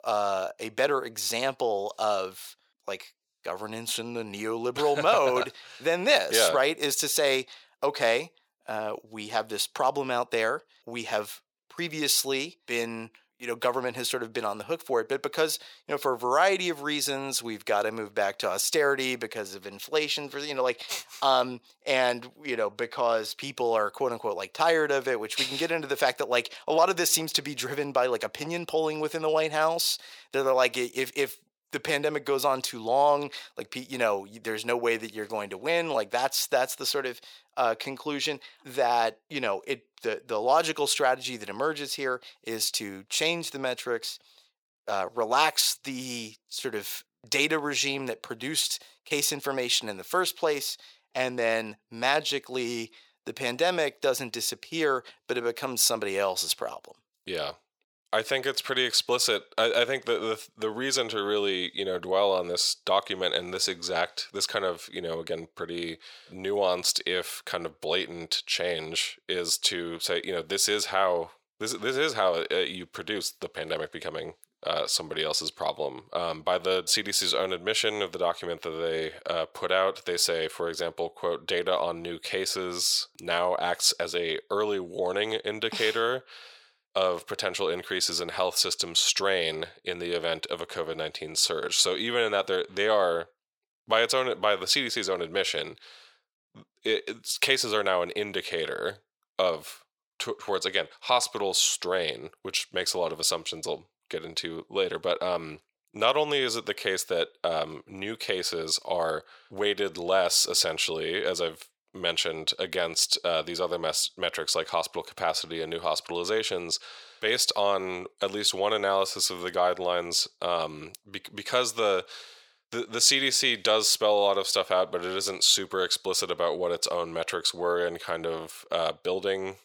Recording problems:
thin; very; fading below 550 Hz

